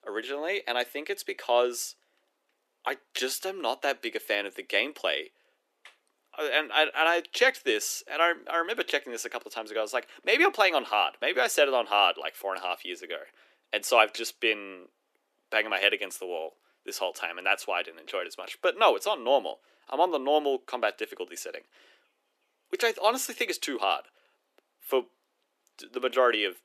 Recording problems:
thin; somewhat; fading below 300 Hz

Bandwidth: 14 kHz